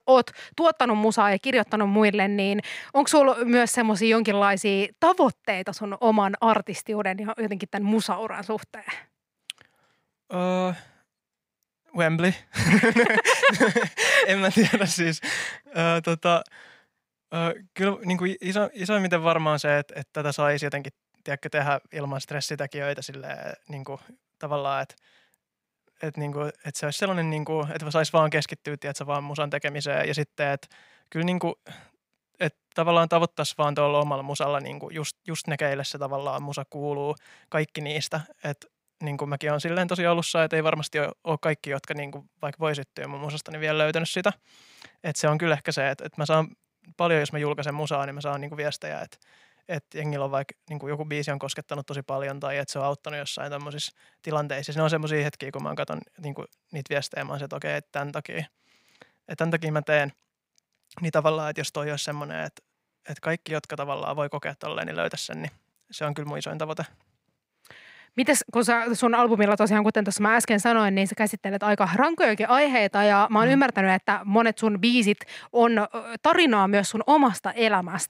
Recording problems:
none

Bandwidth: 15.5 kHz